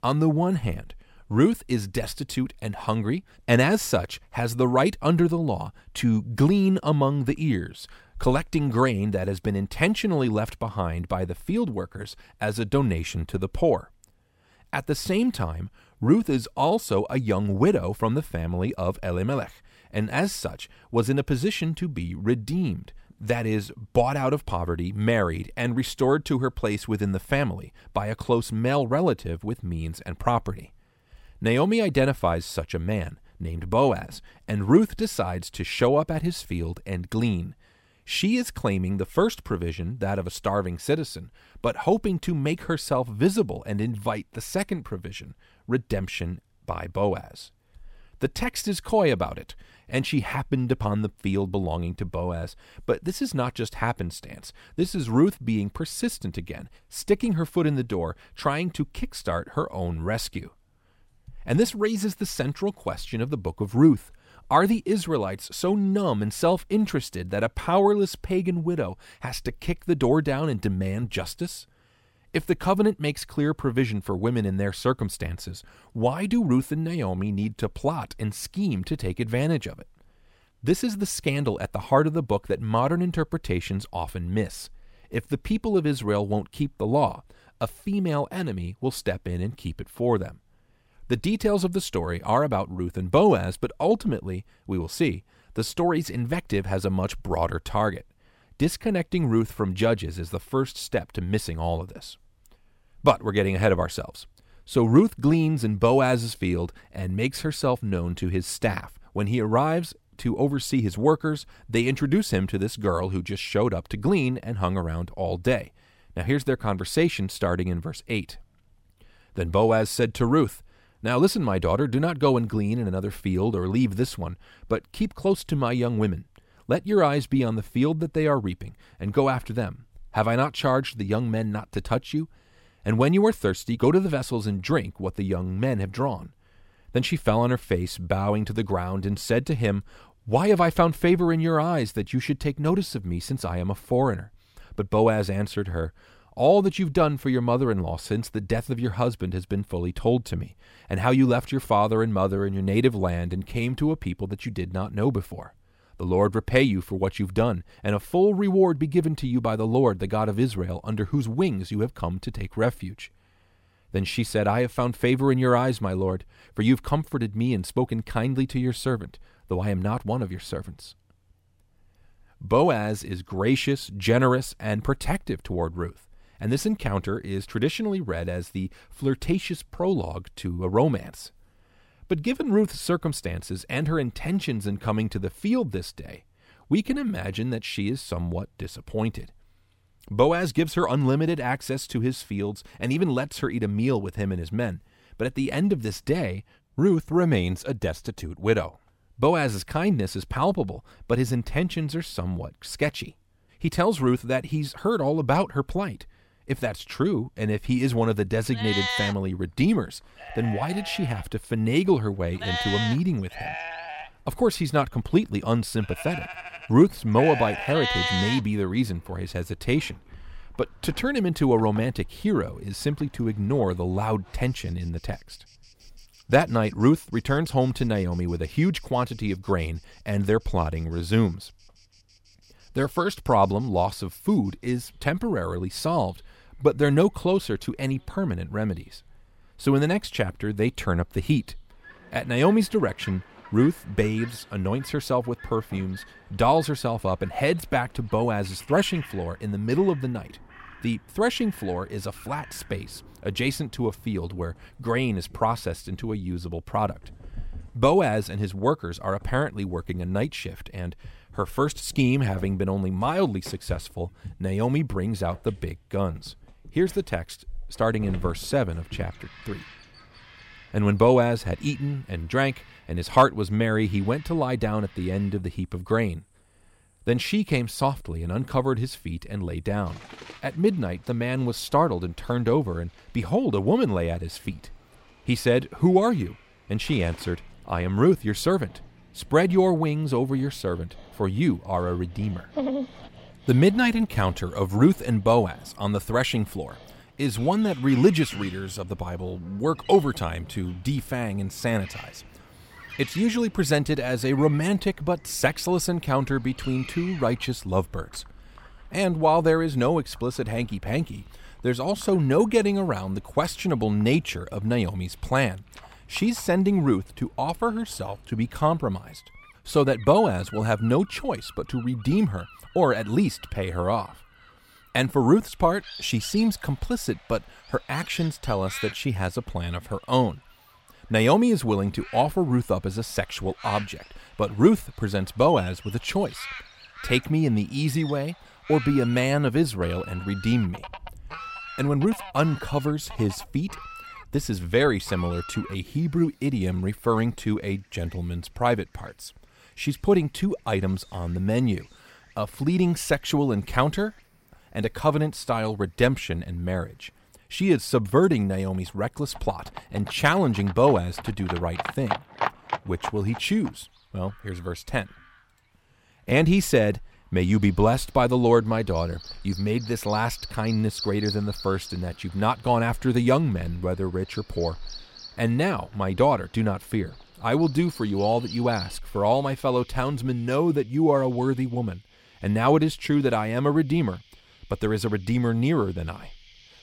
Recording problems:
animal sounds; noticeable; from 3:28 on; 15 dB below the speech

